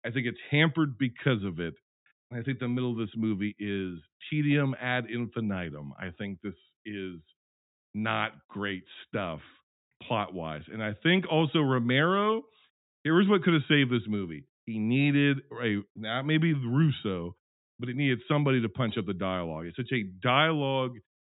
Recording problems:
high frequencies cut off; severe; nothing above 4 kHz

